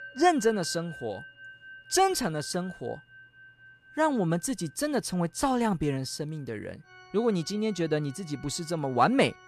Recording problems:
background music; noticeable; throughout; 20 dB below the speech

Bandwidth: 13.5 kHz